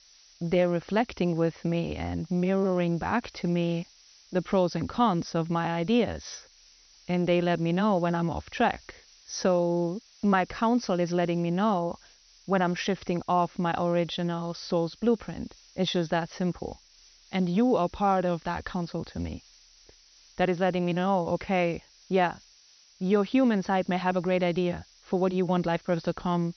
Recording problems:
high frequencies cut off; noticeable; nothing above 6 kHz
hiss; faint; throughout; 25 dB below the speech

